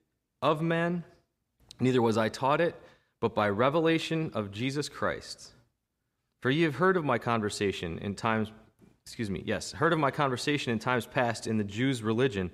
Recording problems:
none

